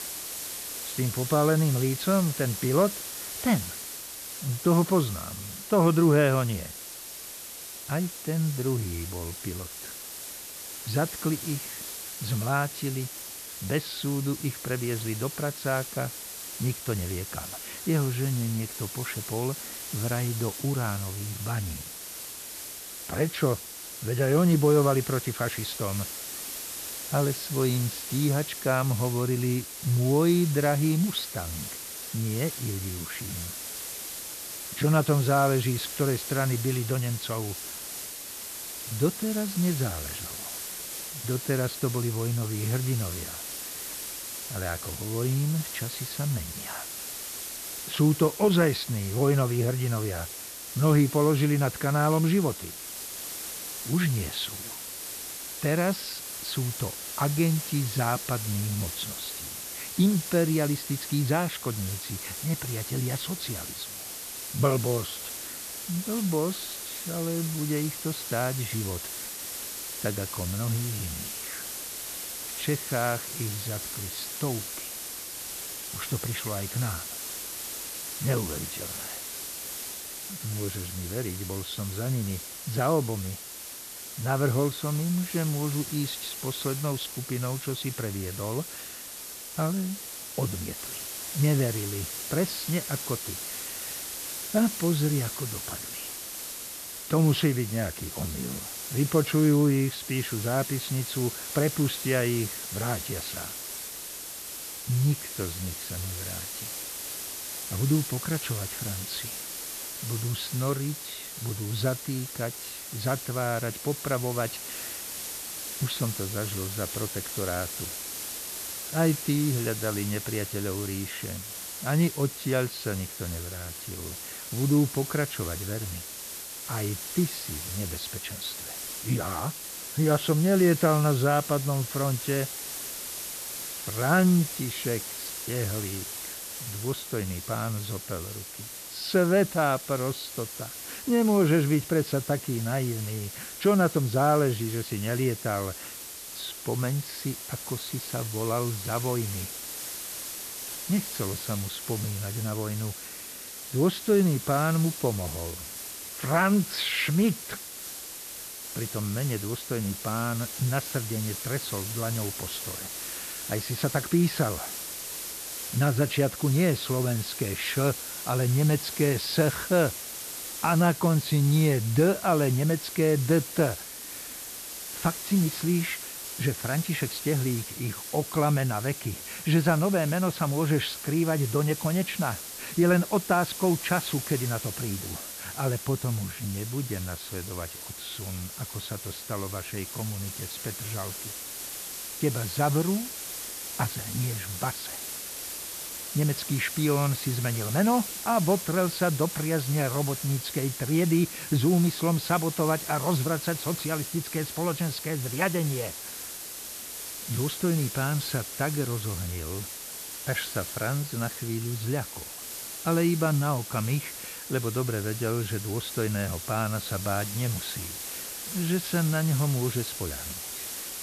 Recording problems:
high frequencies cut off; noticeable; nothing above 5.5 kHz
hiss; loud; throughout; 7 dB below the speech

